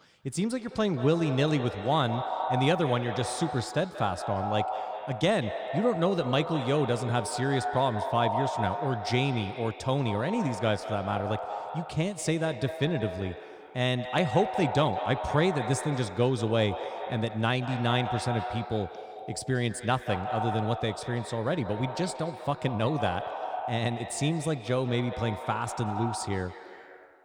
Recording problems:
echo of what is said; strong; throughout; 180 ms later, 6 dB below the speech

